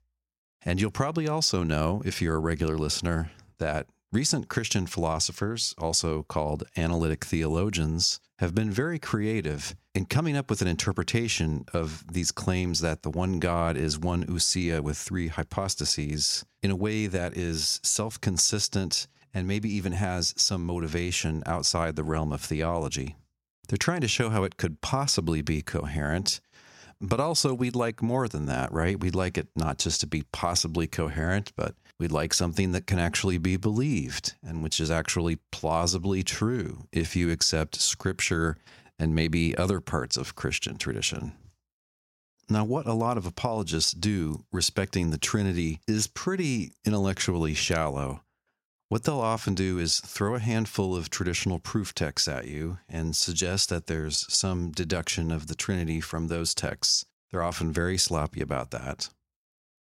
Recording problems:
none

